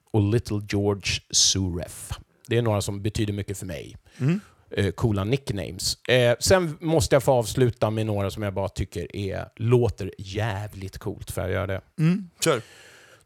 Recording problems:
none

